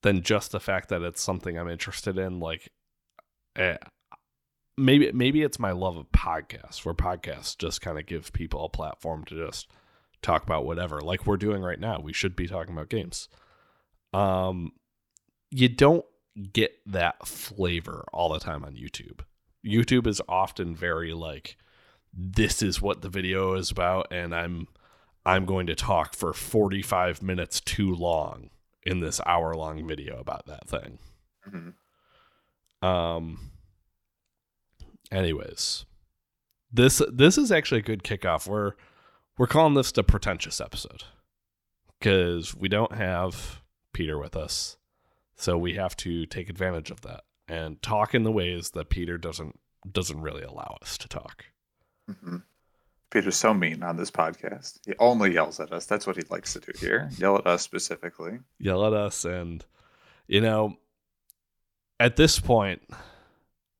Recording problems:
none

